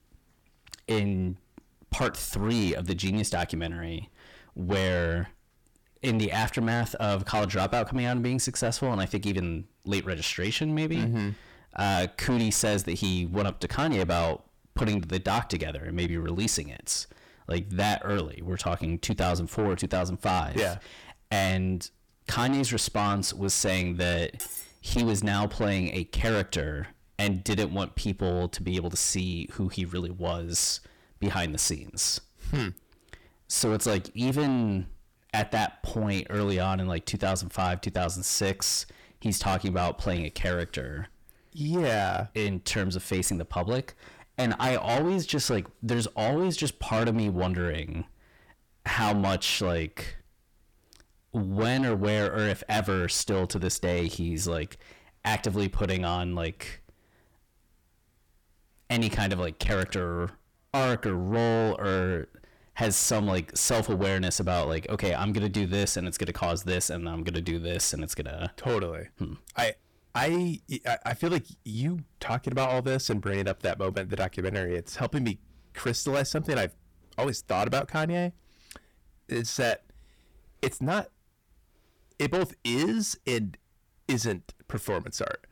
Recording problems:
distortion; heavy; 7 dB below the speech
clattering dishes; noticeable; at 24 s; peak 7 dB below the speech

